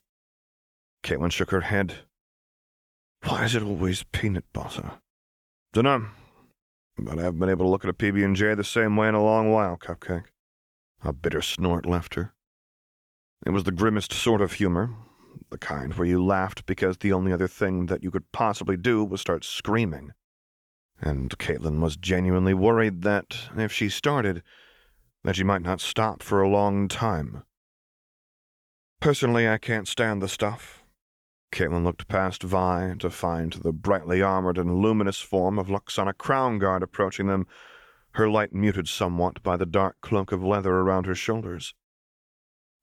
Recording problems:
none

